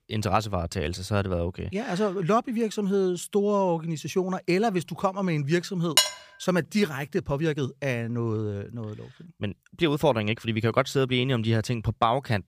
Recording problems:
uneven, jittery; strongly; from 3 to 11 s
clattering dishes; loud; at 6 s; peak 5 dB above the speech

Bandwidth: 15 kHz